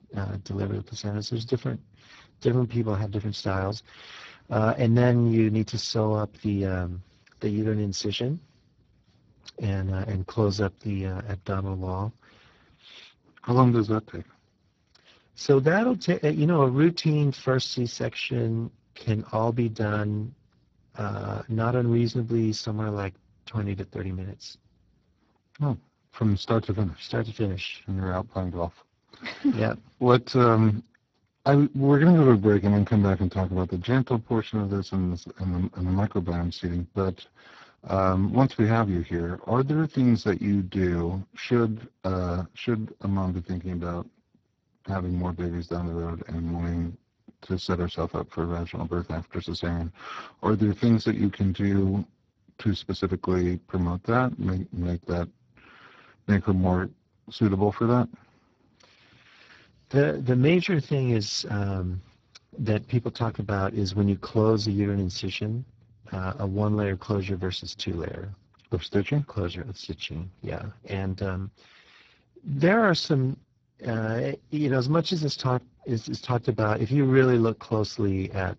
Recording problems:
garbled, watery; badly; nothing above 16.5 kHz
uneven, jittery; strongly; from 2 s to 1:00

